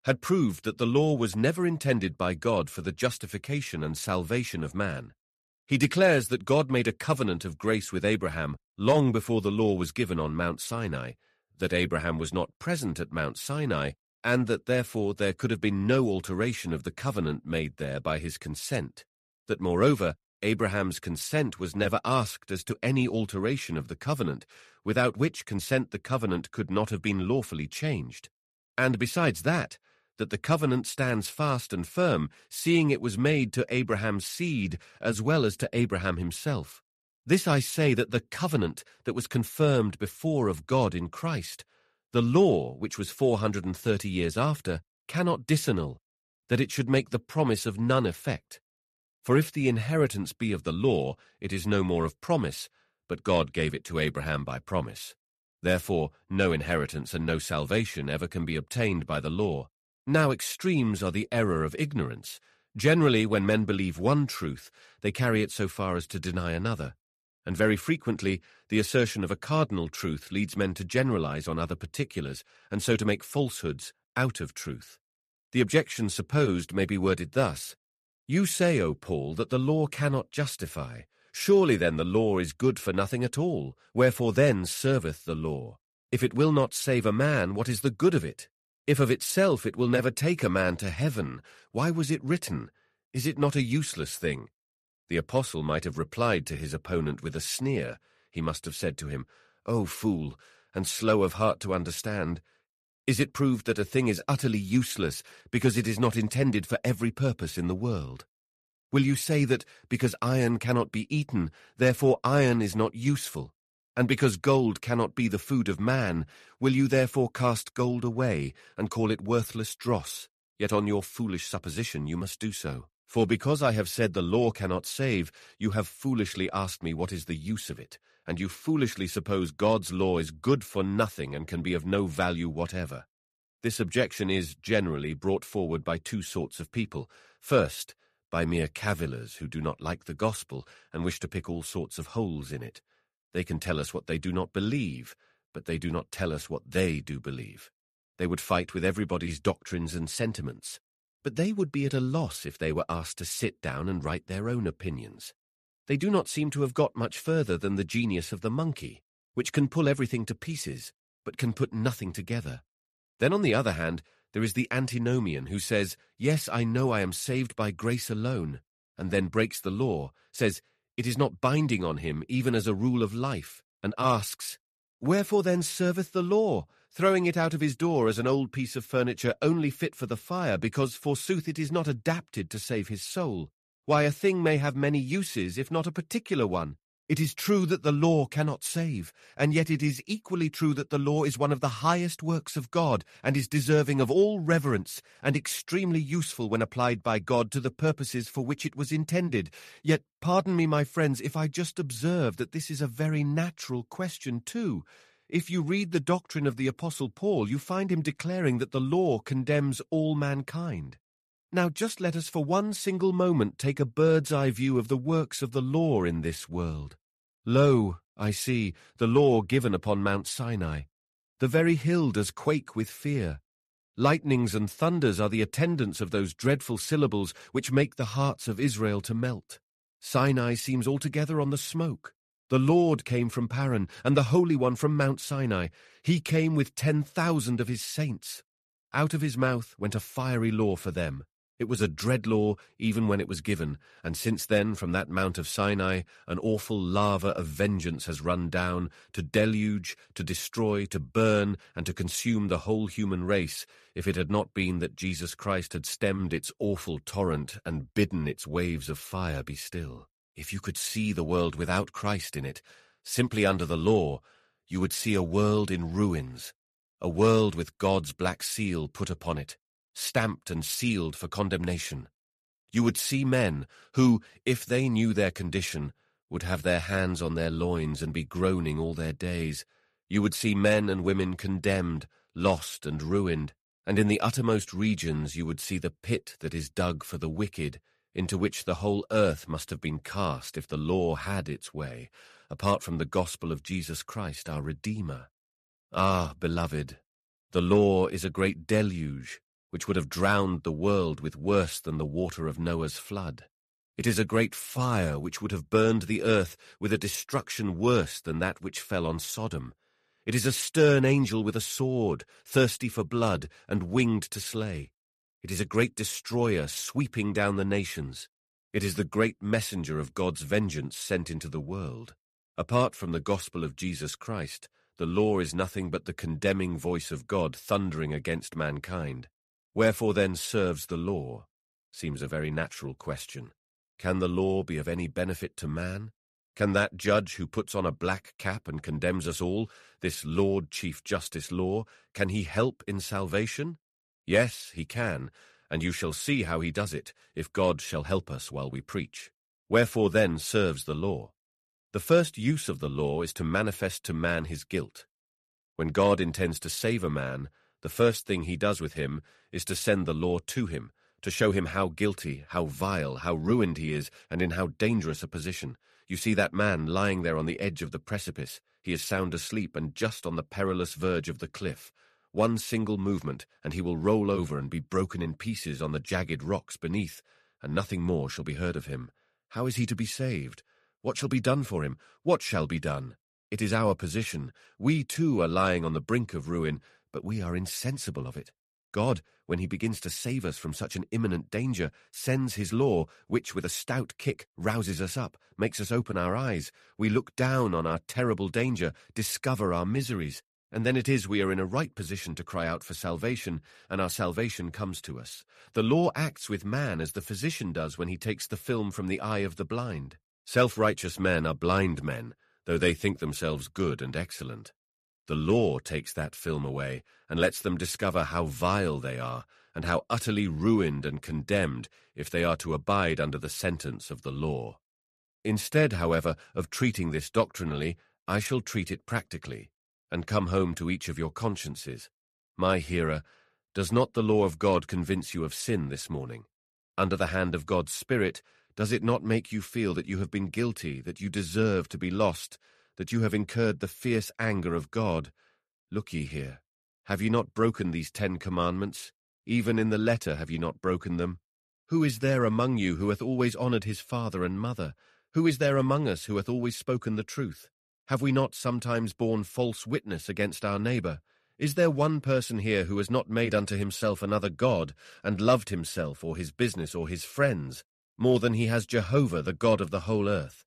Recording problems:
none

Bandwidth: 14 kHz